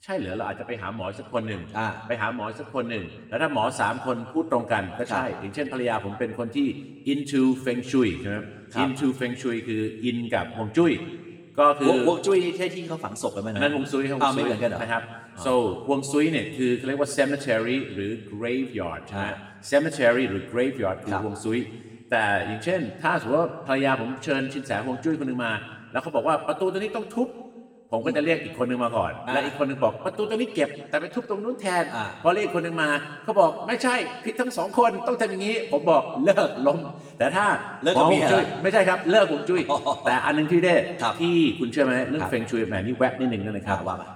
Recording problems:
room echo; slight; dies away in 1.3 s
off-mic speech; somewhat distant

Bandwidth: 18.5 kHz